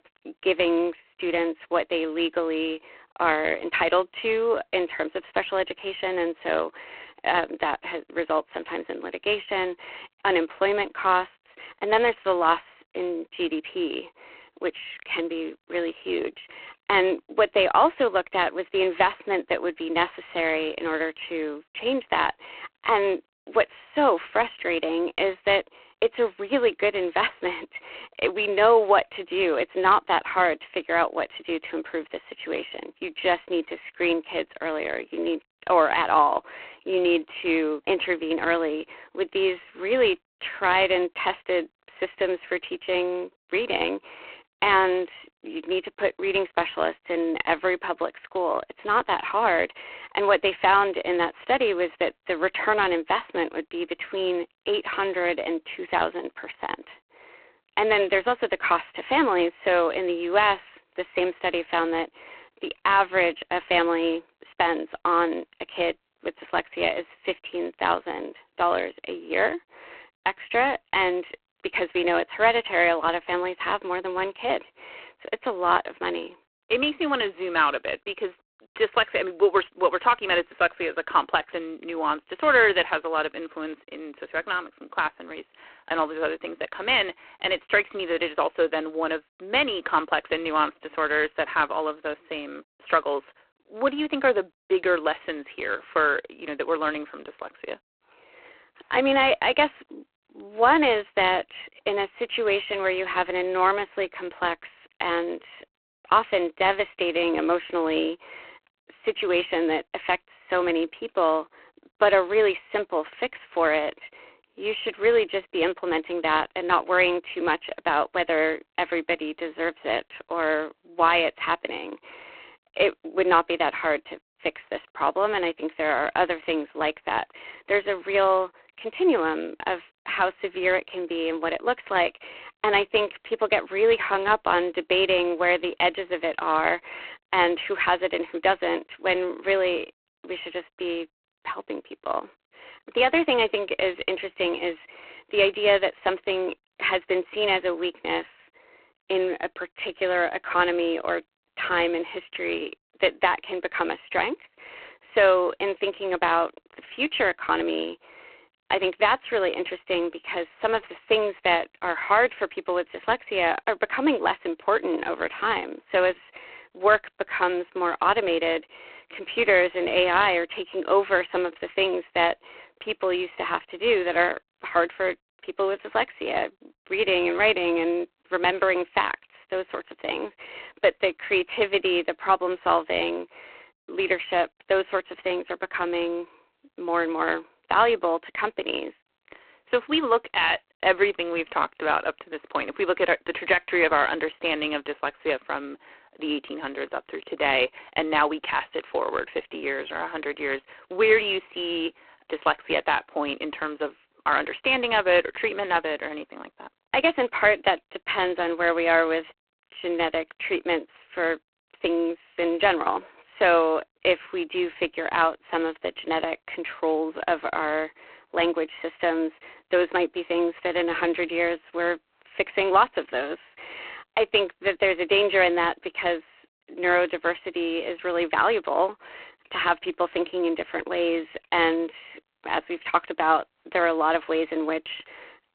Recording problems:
phone-call audio; poor line

